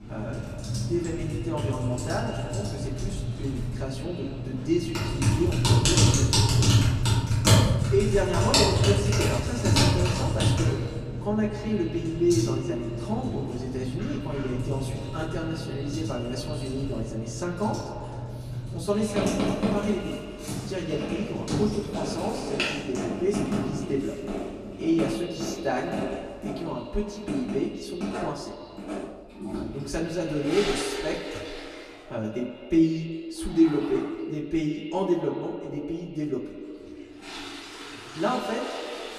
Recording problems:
echo of what is said; strong; throughout; 100 ms later, 7 dB below the speech
off-mic speech; far
room echo; very slight; dies away in 0.2 s
household noises; very loud; throughout; 2 dB above the speech

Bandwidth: 14.5 kHz